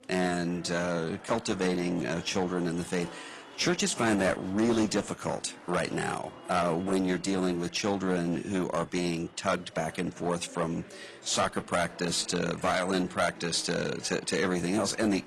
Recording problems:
distortion; slight; 7% of the sound clipped
garbled, watery; slightly
chatter from many people; noticeable; throughout; 20 dB below the speech

